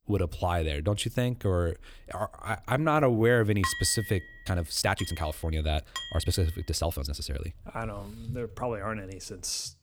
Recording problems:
uneven, jittery; strongly; from 2.5 to 8.5 s
clattering dishes; noticeable; from 3.5 to 6 s; peak 3 dB below the speech

